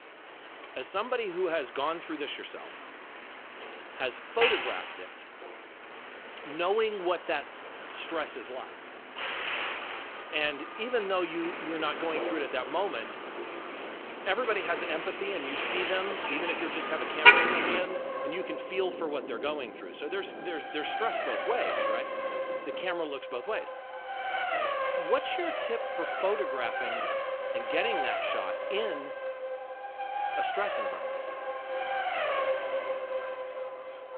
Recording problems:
phone-call audio
traffic noise; very loud; throughout; 2 dB above the speech
wind noise on the microphone; occasional gusts; from 11 to 23 s; 15 dB below the speech

